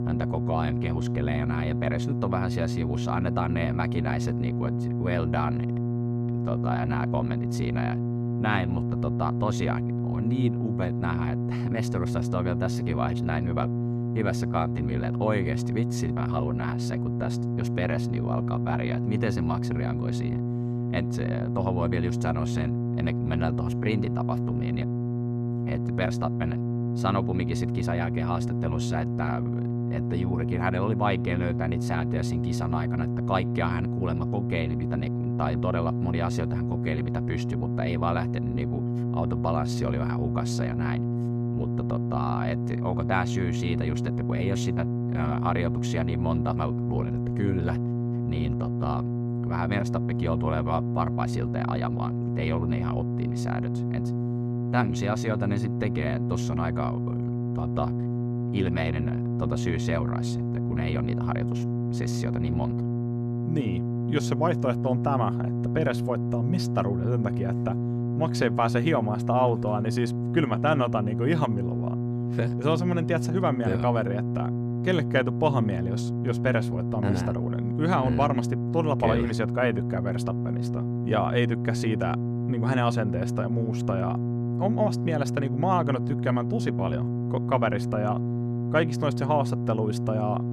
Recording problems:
electrical hum; loud; throughout; 60 Hz, 5 dB below the speech

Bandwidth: 14.5 kHz